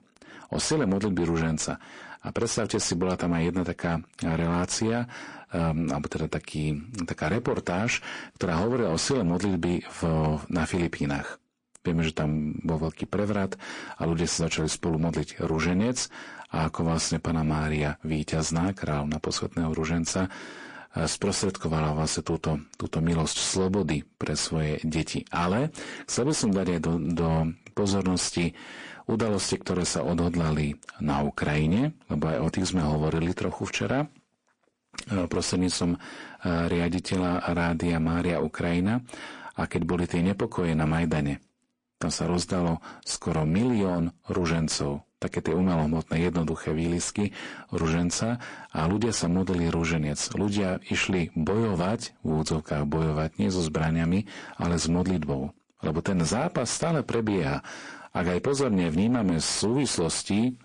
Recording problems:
distortion; slight; 10 dB below the speech
garbled, watery; slightly; nothing above 8.5 kHz

